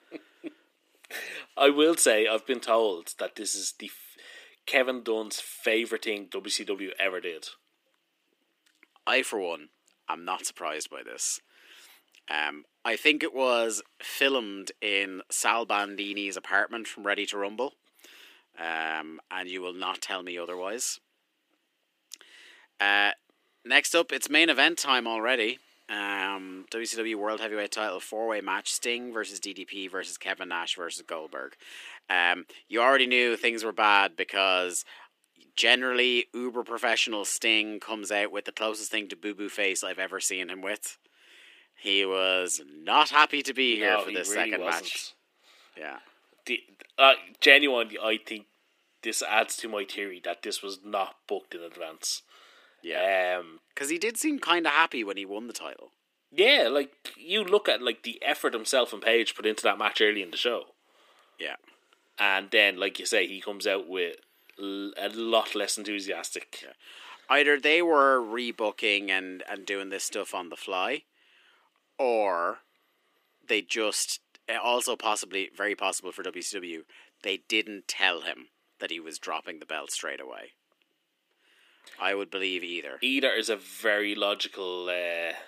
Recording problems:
thin; somewhat; fading below 300 Hz

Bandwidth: 15 kHz